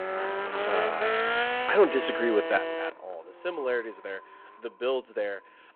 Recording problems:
echo of what is said; faint; throughout; 530 ms later, 20 dB below the speech
phone-call audio
traffic noise; very loud; throughout; as loud as the speech
alarm; noticeable; from 2 to 3 s; peak 3 dB below the speech

